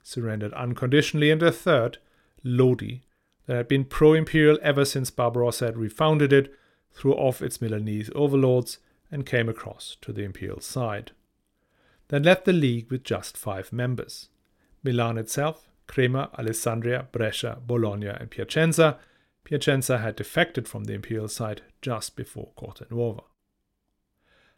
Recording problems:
none

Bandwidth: 16.5 kHz